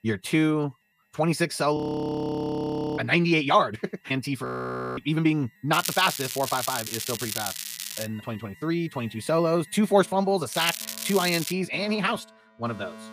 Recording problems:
wrong speed, natural pitch; too fast; 1.5 times normal speed
crackling; loud; from 5.5 to 8 s and at 11 s; 6 dB below the speech
alarms or sirens; faint; throughout; 25 dB below the speech
audio freezing; at 2 s for 1 s and at 4.5 s for 0.5 s

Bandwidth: 15 kHz